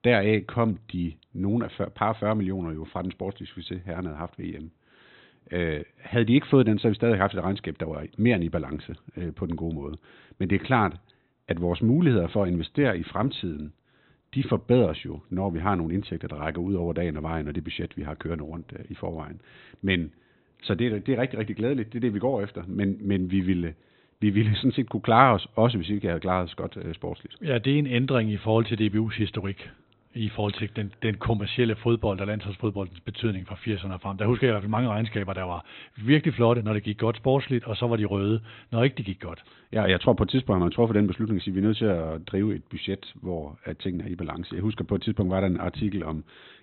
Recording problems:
high frequencies cut off; severe; nothing above 4 kHz

